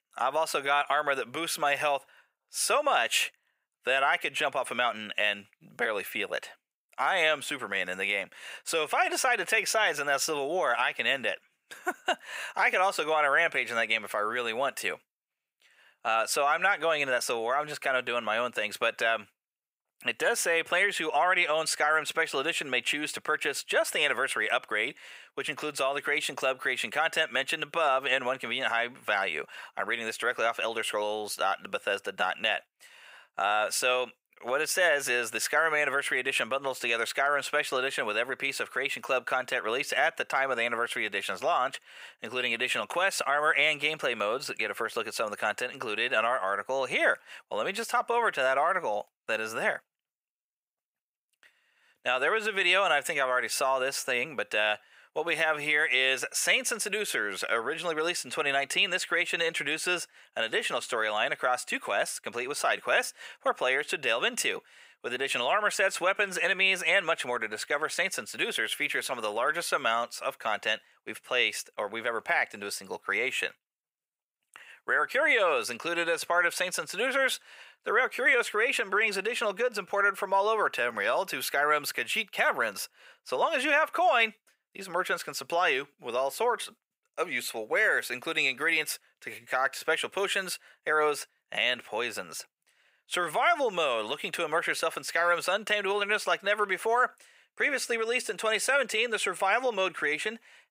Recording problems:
thin; very; fading below 600 Hz

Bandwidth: 15.5 kHz